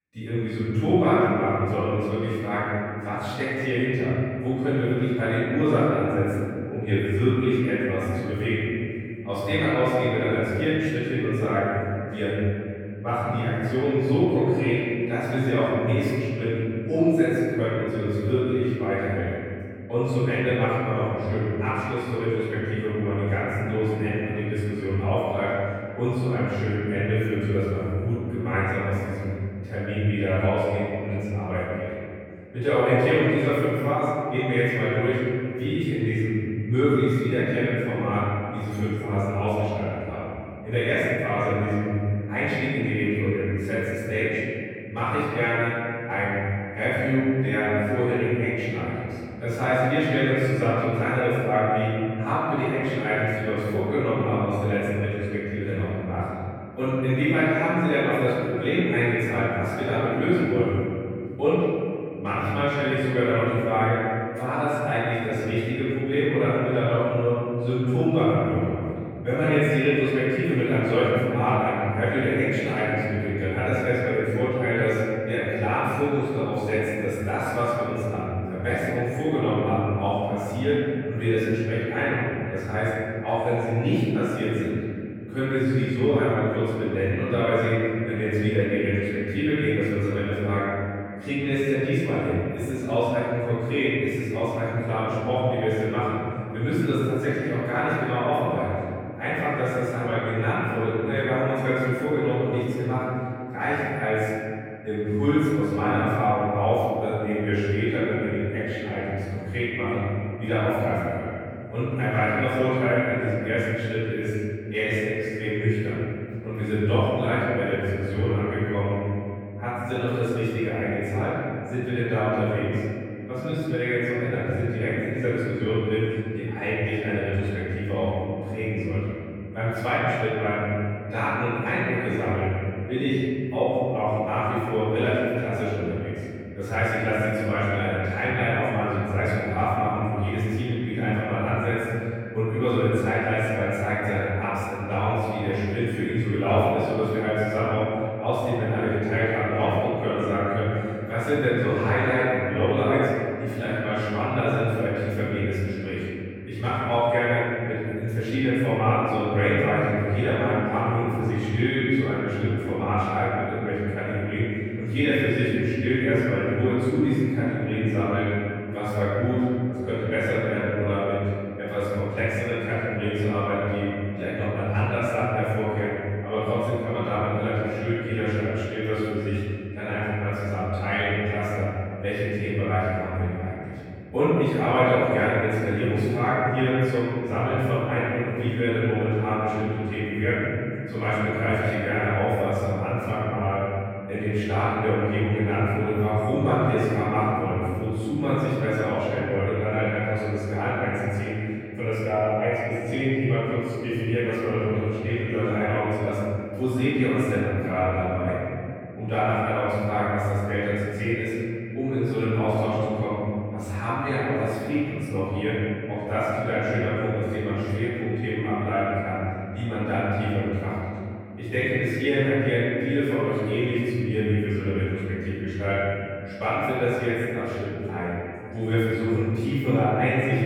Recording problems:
room echo; strong; dies away in 2.9 s
off-mic speech; far

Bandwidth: 18.5 kHz